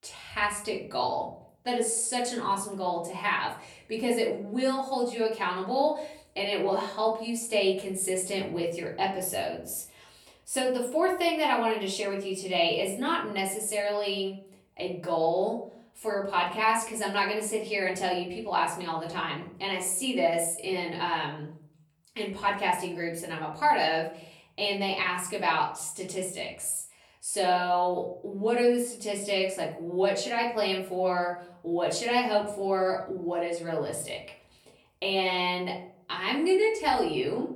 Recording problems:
off-mic speech; far
room echo; slight; dies away in 0.5 s

